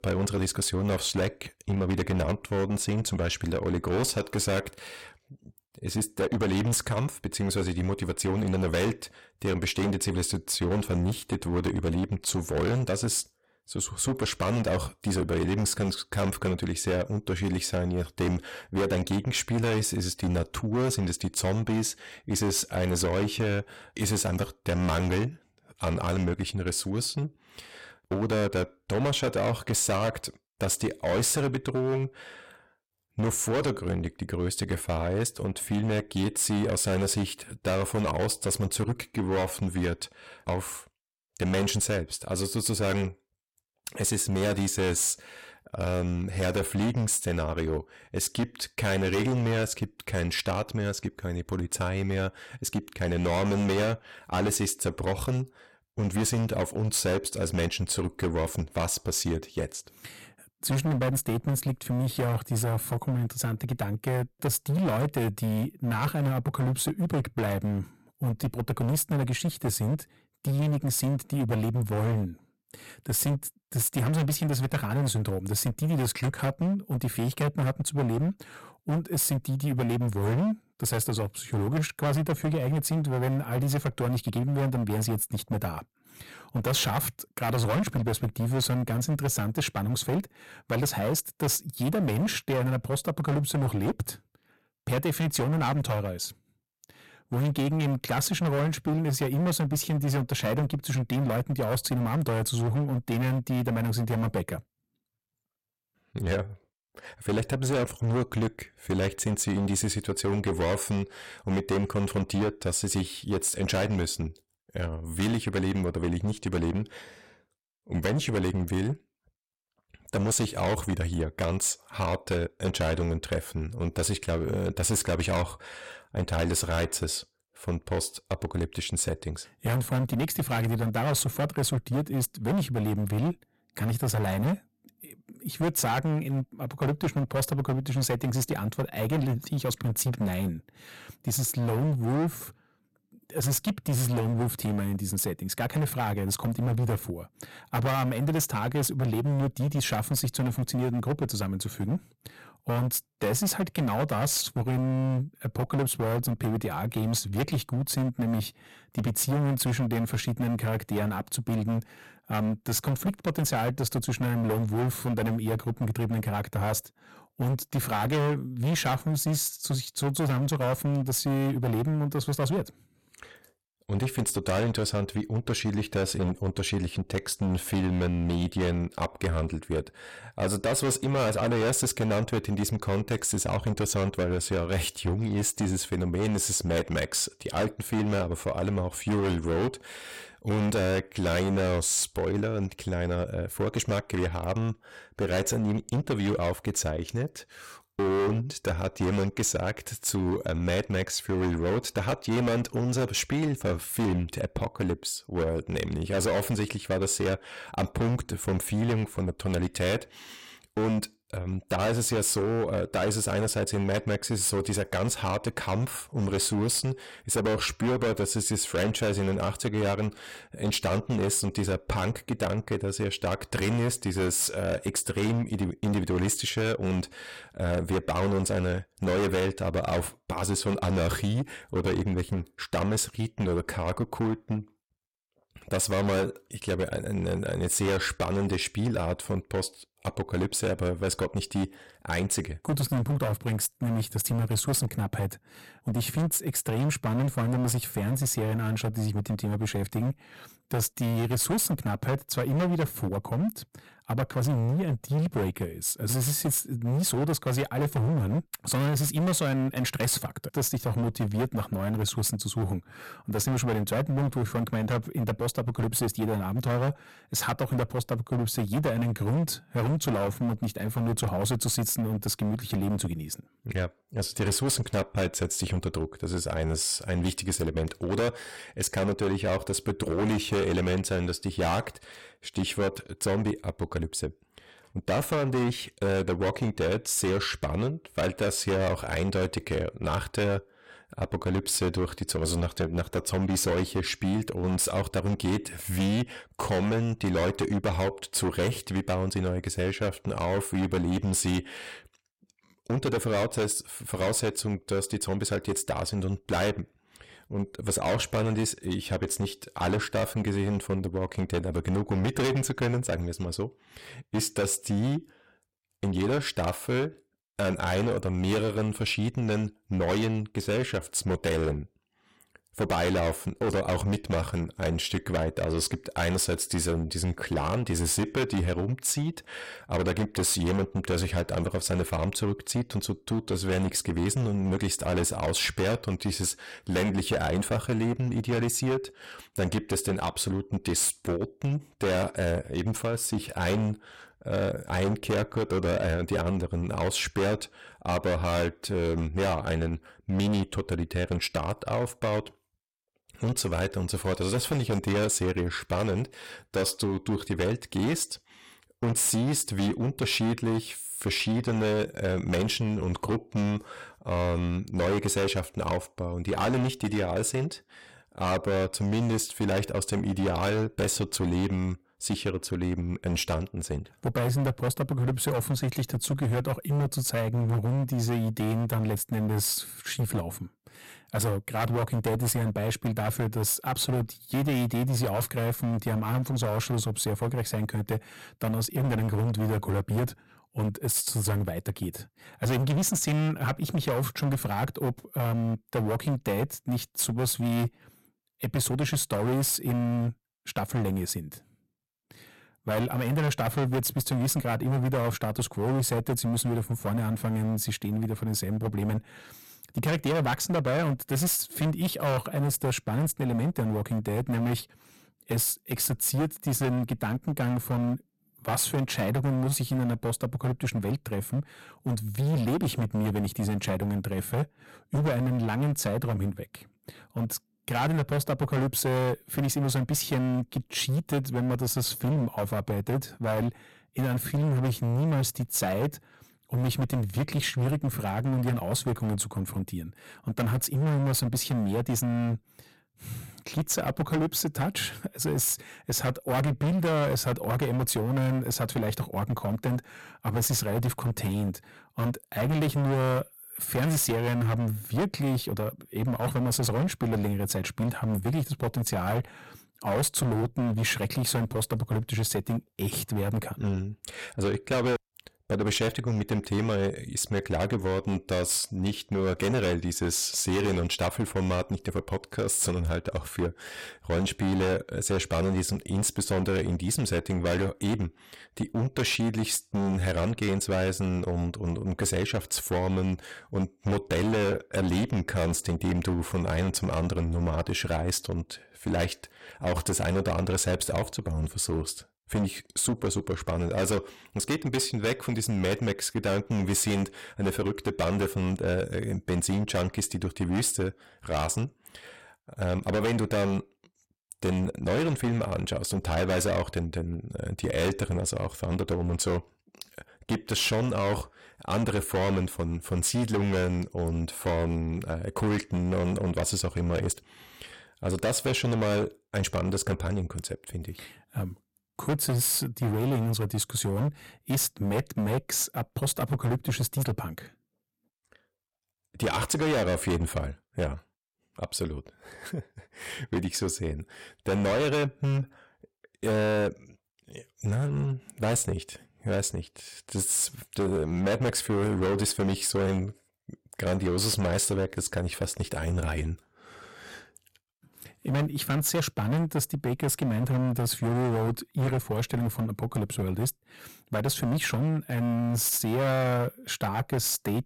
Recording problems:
distortion; heavy; 18% of the sound clipped

